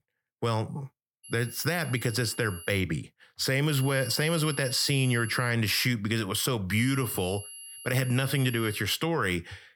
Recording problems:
high-pitched whine; noticeable; from 1 to 3 s, from 3.5 to 5.5 s and from 7 to 9 s; 11 kHz, 15 dB below the speech

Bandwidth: 17 kHz